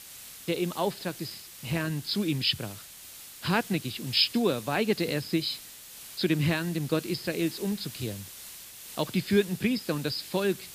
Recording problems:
high frequencies cut off; noticeable; nothing above 5.5 kHz
hiss; noticeable; throughout; 15 dB below the speech

